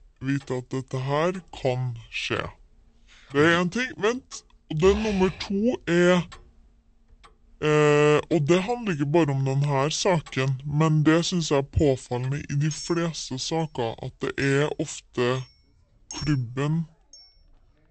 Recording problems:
wrong speed and pitch; too slow and too low; 0.7 times normal speed
household noises; faint; throughout; 20 dB below the speech

